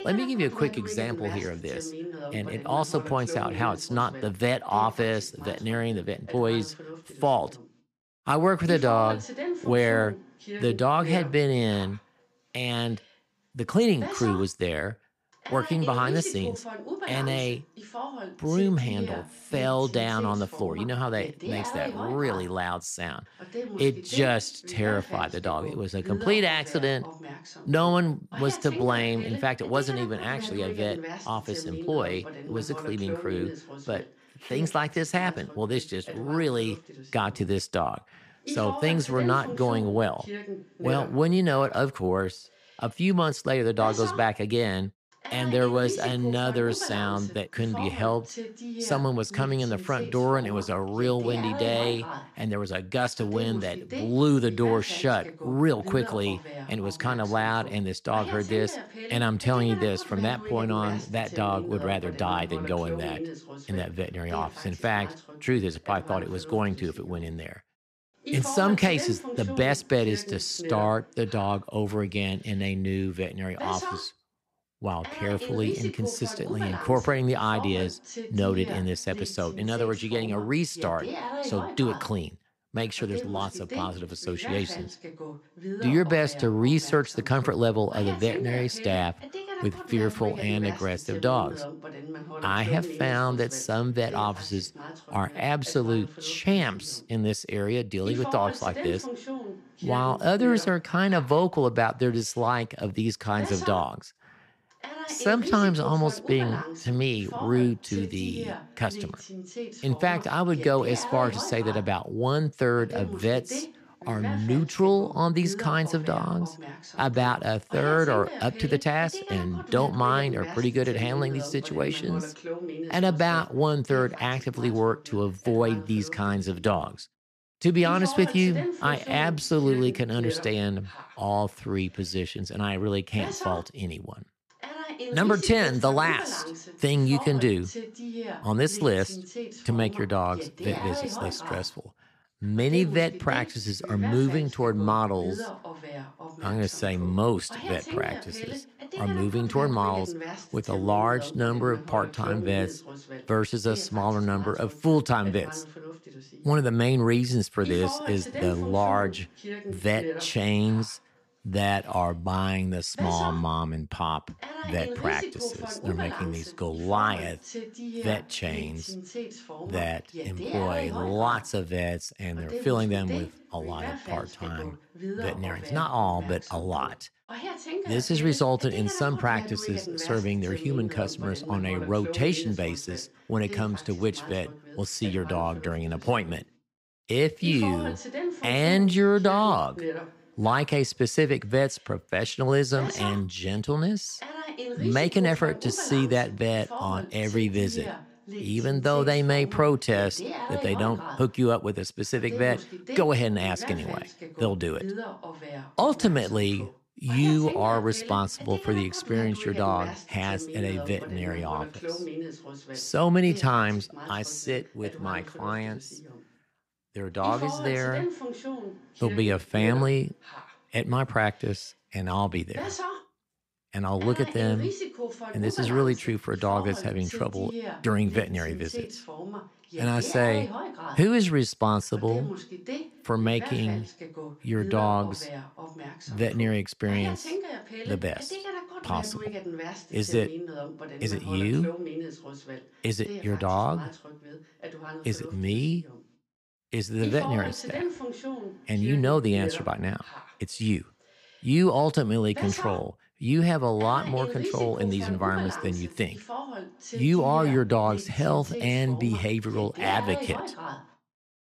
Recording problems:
voice in the background; noticeable; throughout; 10 dB below the speech

